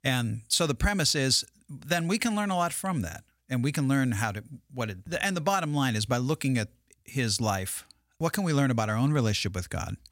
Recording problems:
none

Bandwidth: 16.5 kHz